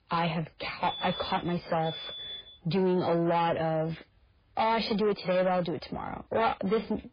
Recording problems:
garbled, watery; badly; nothing above 4 kHz
distortion; slight; 10 dB below the speech
alarm; noticeable; from 1 to 2.5 s; peak 7 dB below the speech

